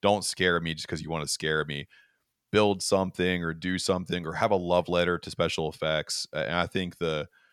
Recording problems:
none

